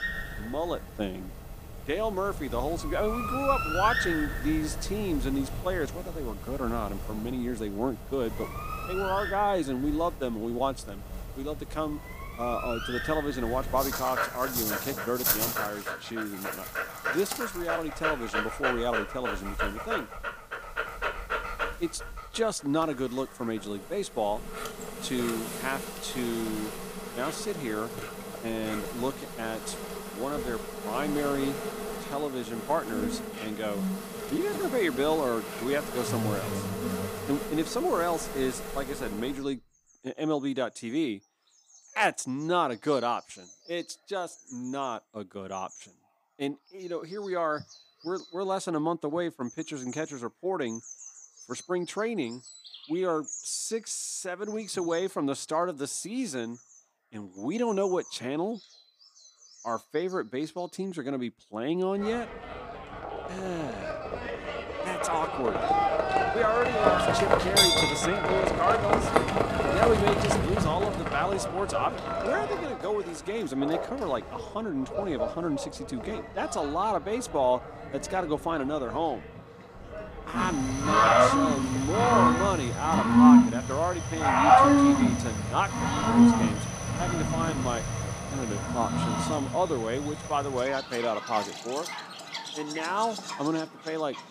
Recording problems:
animal sounds; very loud; throughout; 3 dB above the speech

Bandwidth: 15 kHz